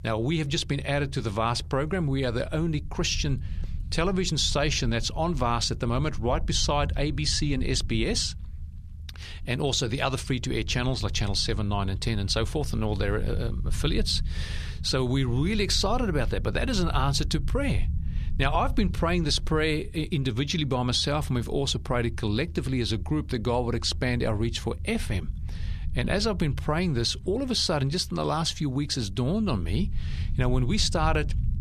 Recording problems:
low rumble; faint; throughout; 25 dB below the speech

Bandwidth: 13.5 kHz